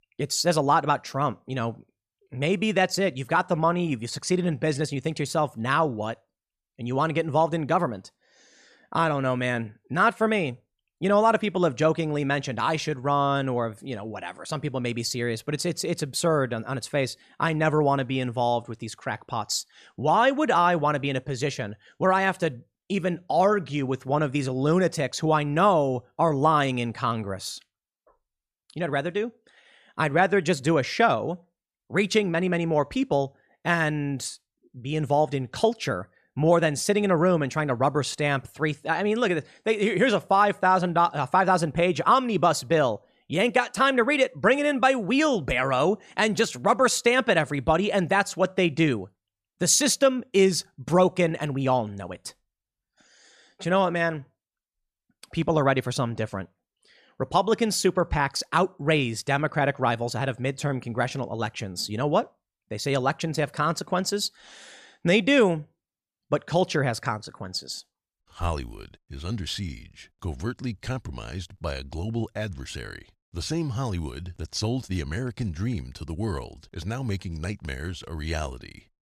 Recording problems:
none

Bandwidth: 14.5 kHz